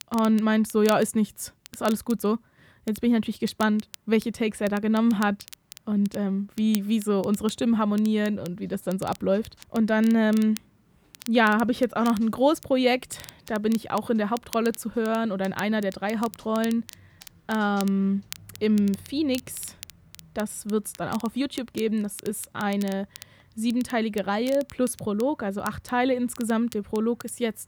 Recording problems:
crackle, like an old record; noticeable; 20 dB below the speech

